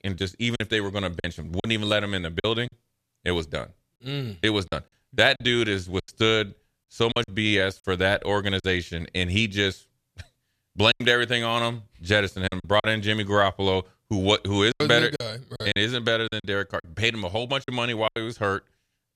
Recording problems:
choppy; very; 8% of the speech affected

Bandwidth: 14.5 kHz